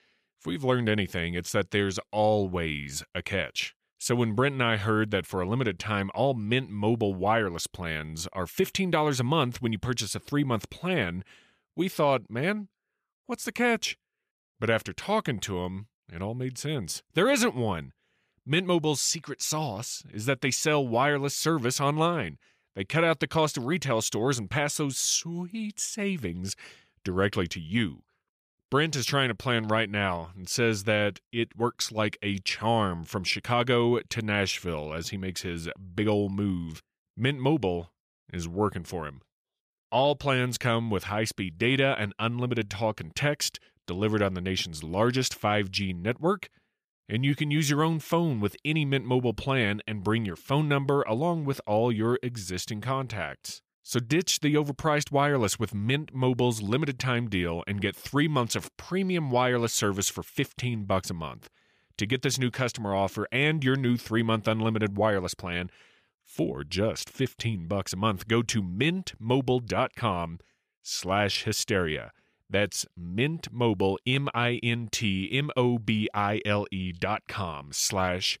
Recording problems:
none

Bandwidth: 14.5 kHz